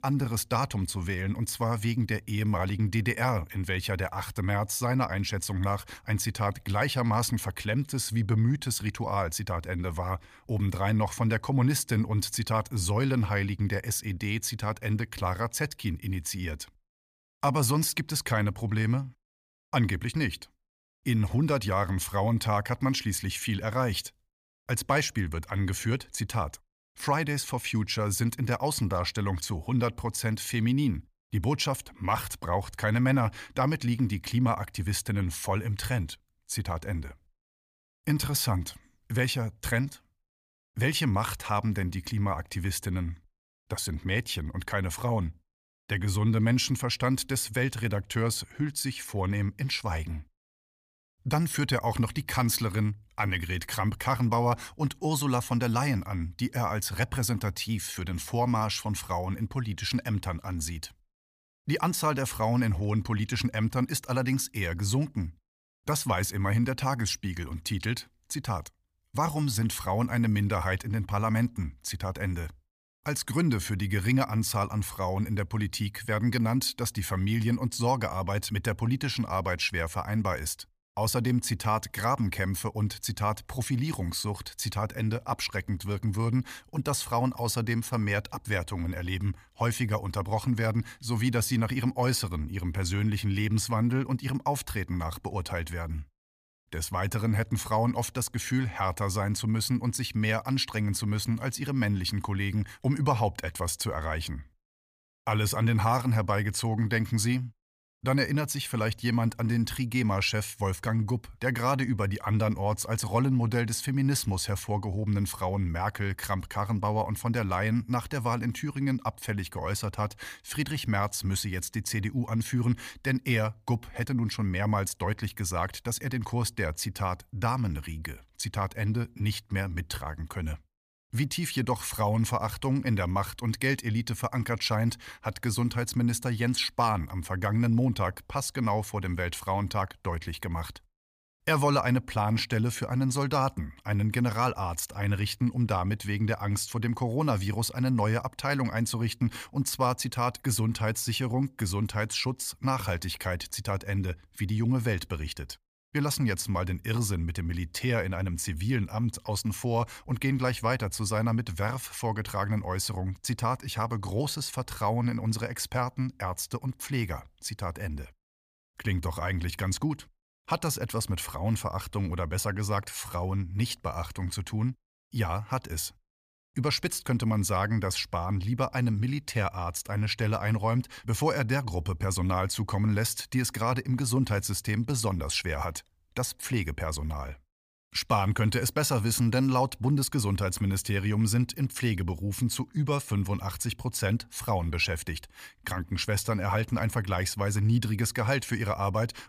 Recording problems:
none

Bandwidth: 15 kHz